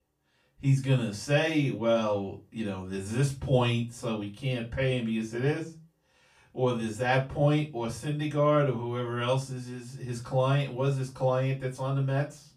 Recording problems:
off-mic speech; far
room echo; very slight; dies away in 0.3 s

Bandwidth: 15 kHz